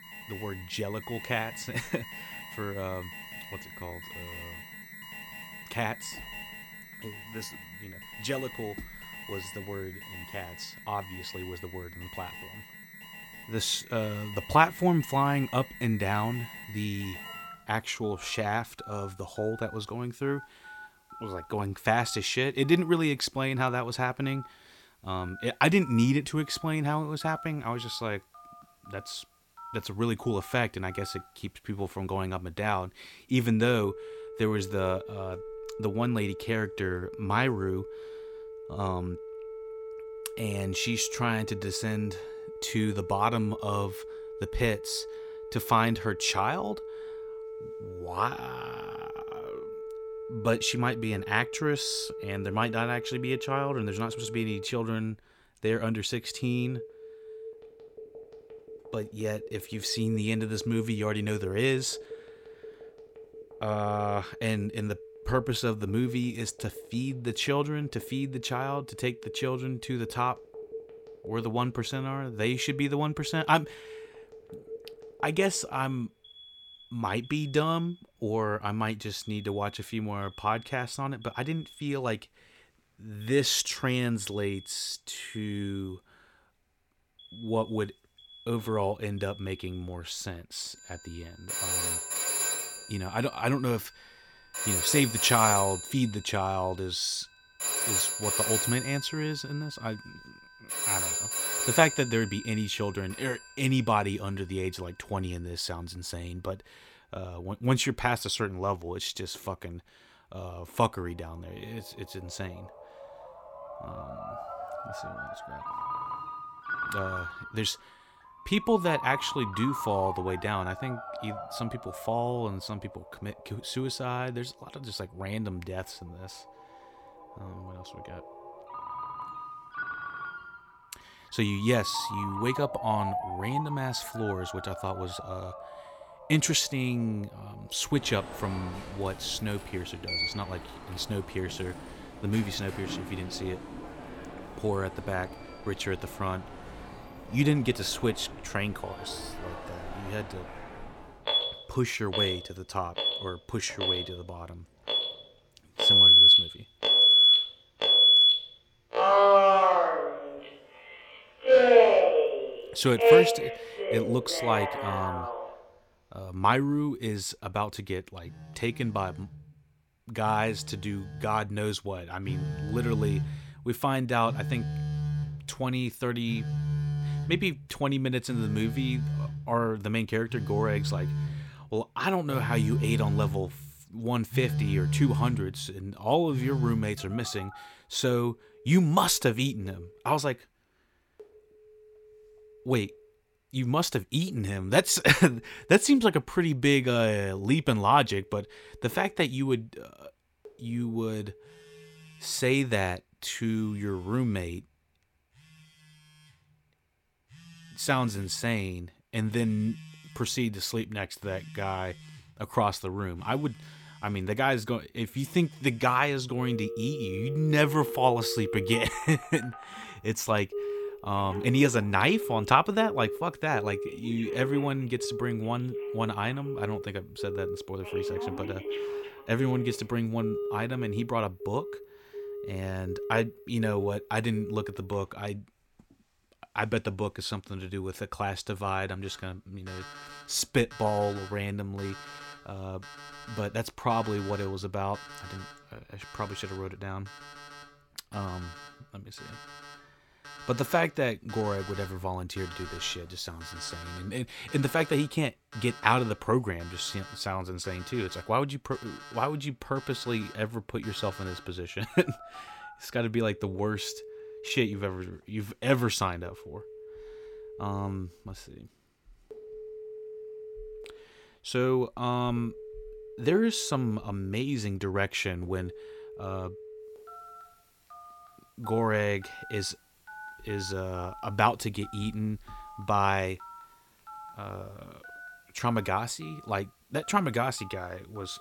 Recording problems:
alarms or sirens; very loud; throughout; 1 dB above the speech

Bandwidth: 17 kHz